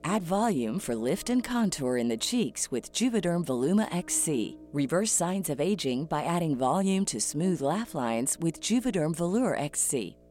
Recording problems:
electrical hum; faint; throughout; 60 Hz, 25 dB below the speech

